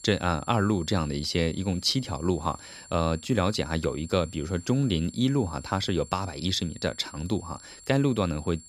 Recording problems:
high-pitched whine; noticeable; throughout; 7.5 kHz, 20 dB below the speech

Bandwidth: 15 kHz